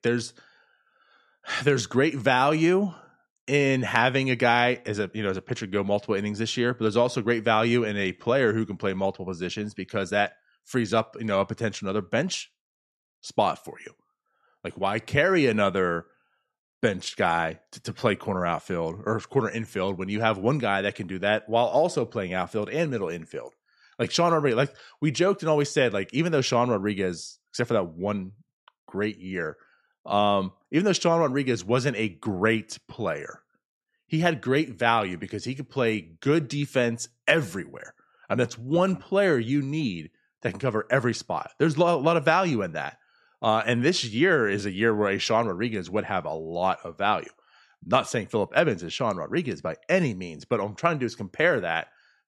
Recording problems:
none

